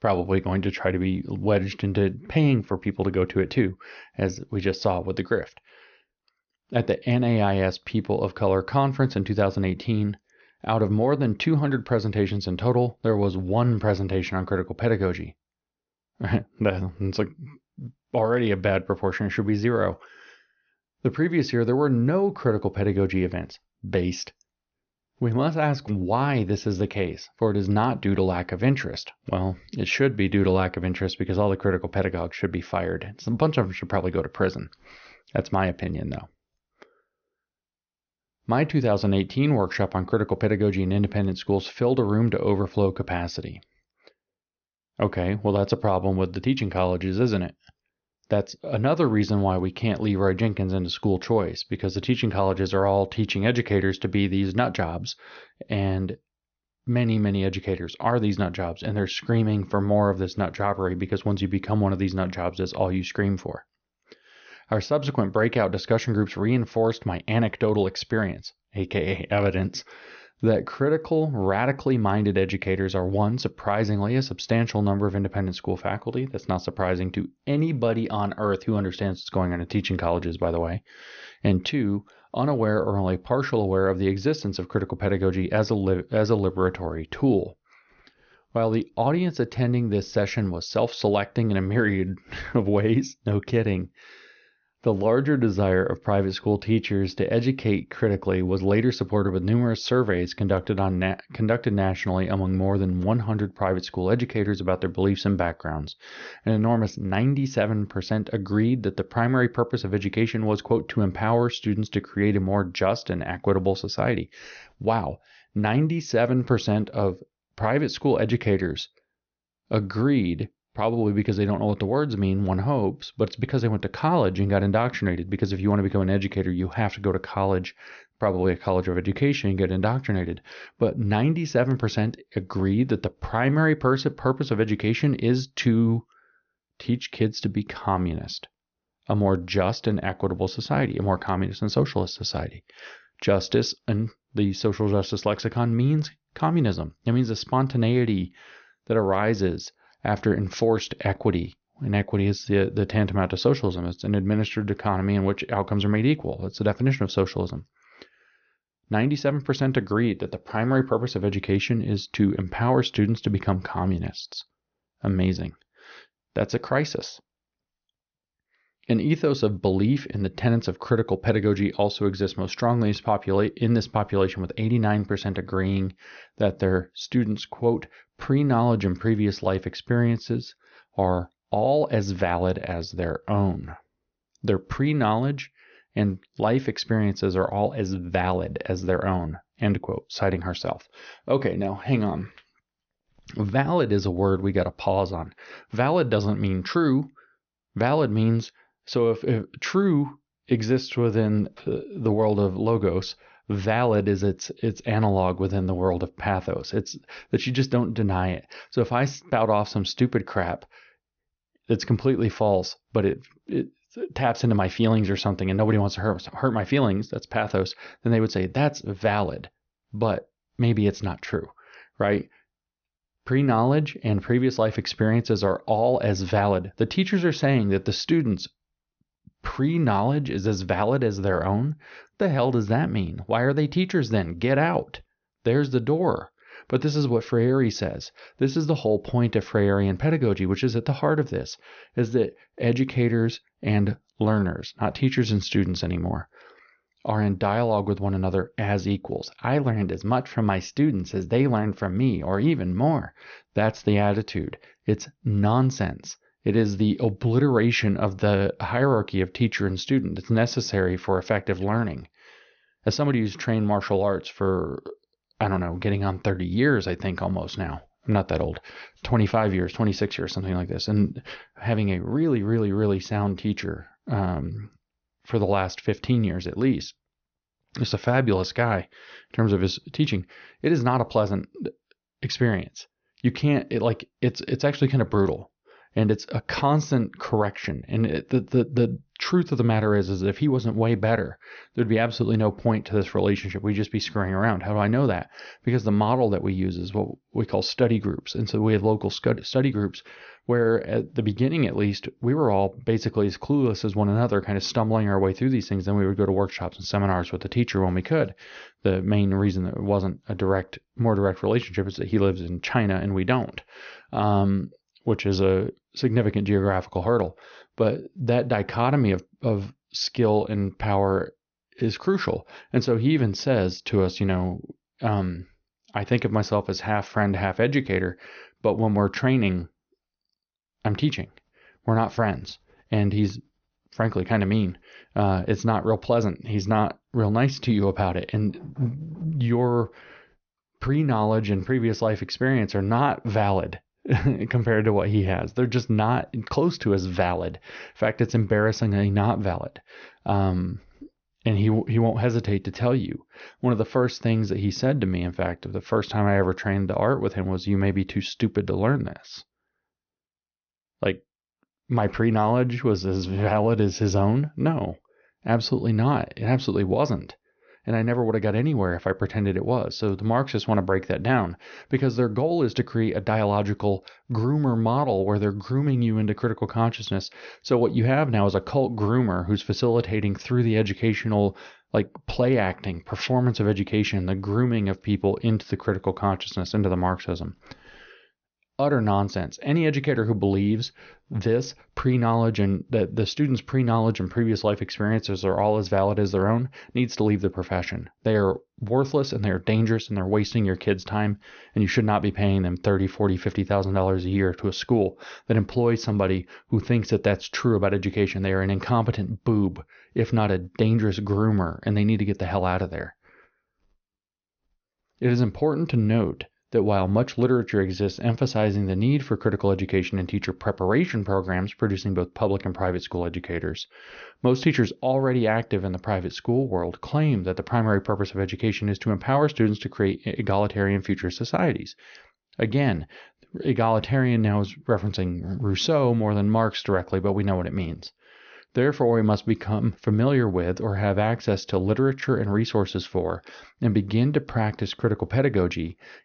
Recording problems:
high frequencies cut off; noticeable; nothing above 6.5 kHz

